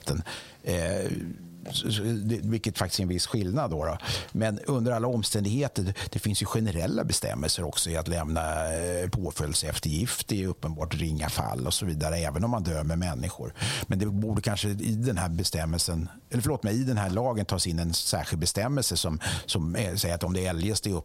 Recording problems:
squashed, flat; heavily

